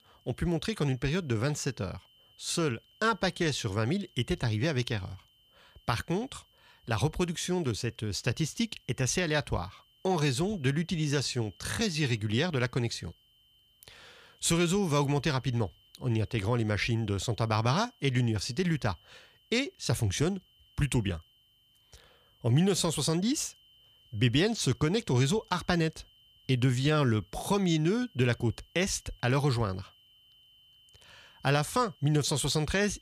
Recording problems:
high-pitched whine; faint; throughout; 3 kHz, 30 dB below the speech

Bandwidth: 15 kHz